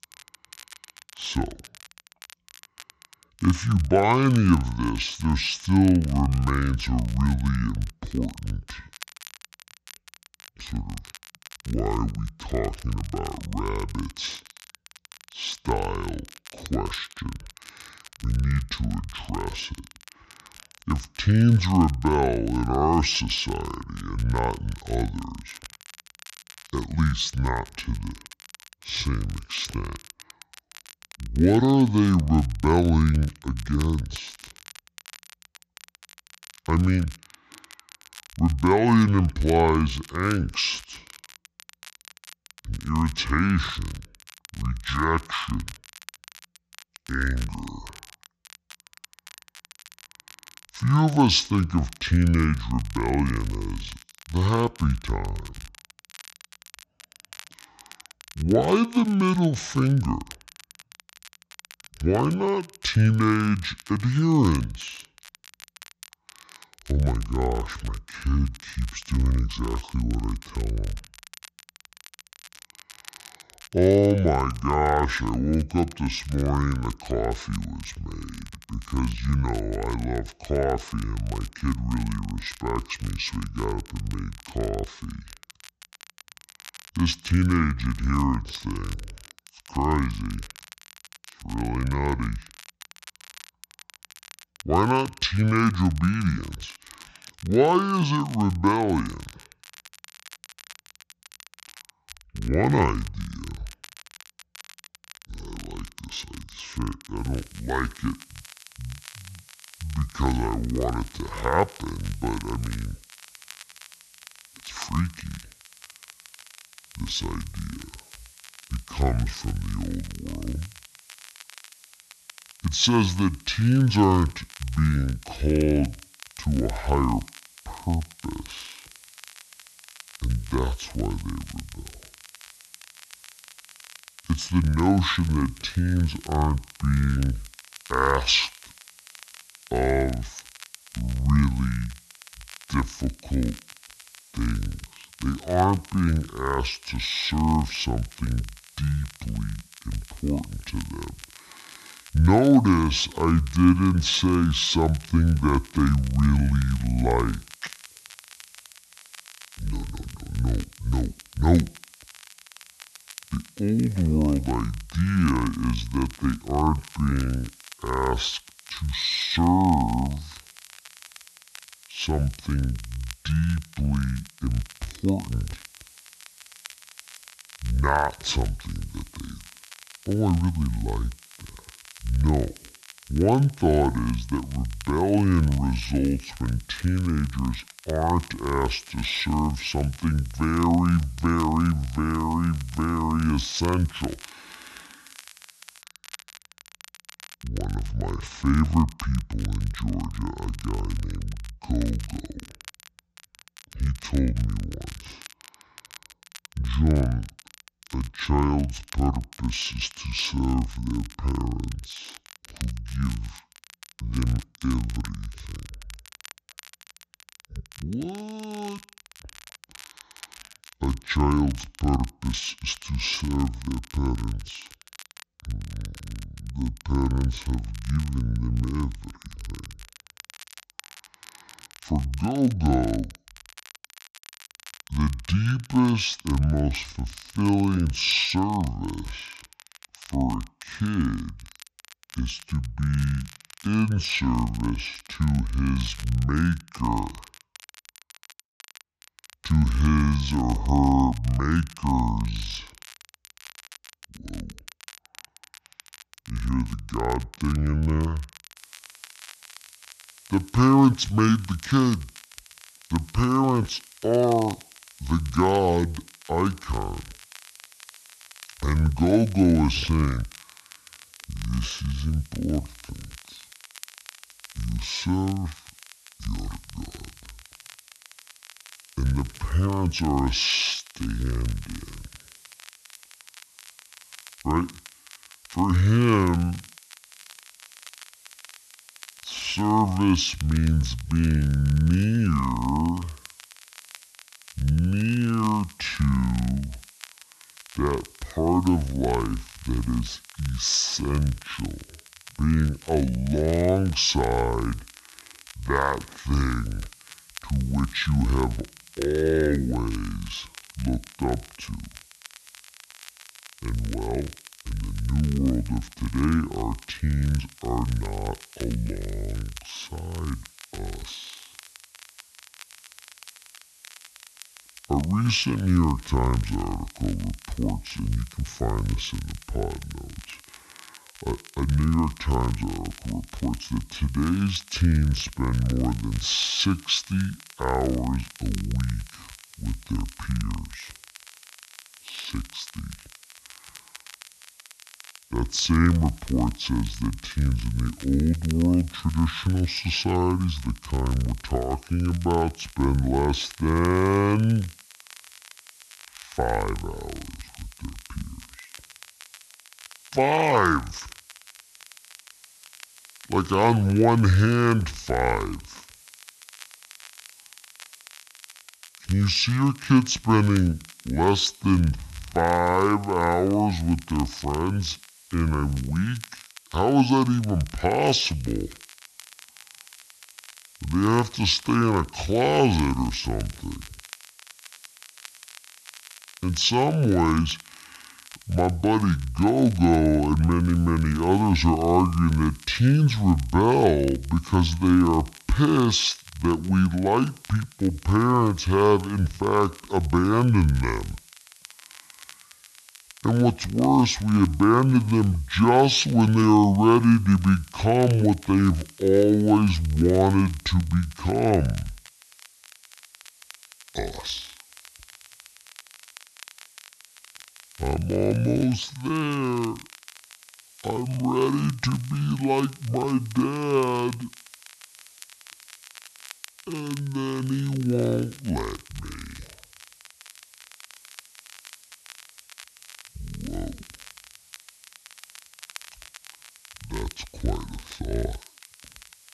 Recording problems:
wrong speed and pitch; too slow and too low; 0.6 times normal speed
high frequencies cut off; noticeable; nothing above 8 kHz
hiss; faint; from 1:47 to 3:16 and from 4:19 on; 25 dB below the speech
crackle, like an old record; faint; 20 dB below the speech

